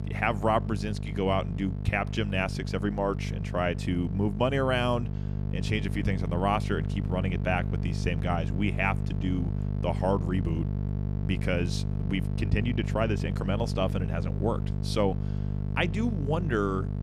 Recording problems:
electrical hum; noticeable; throughout; 50 Hz, 10 dB below the speech

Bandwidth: 14.5 kHz